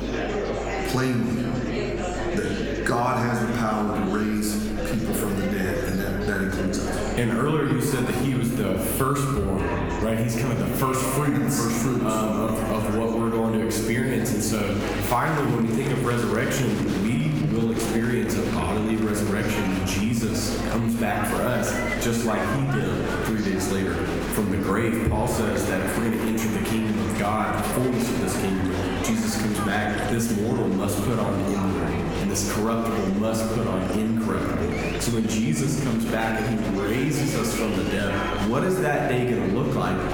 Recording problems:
room echo; noticeable; dies away in 1.1 s
off-mic speech; somewhat distant
squashed, flat; somewhat
murmuring crowd; loud; throughout; 8 dB below the speech
electrical hum; faint; throughout; 50 Hz, 25 dB below the speech

